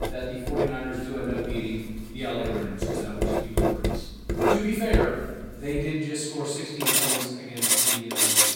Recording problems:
room echo; strong; dies away in 1.2 s
off-mic speech; far
household noises; very loud; throughout; 7 dB above the speech

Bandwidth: 16.5 kHz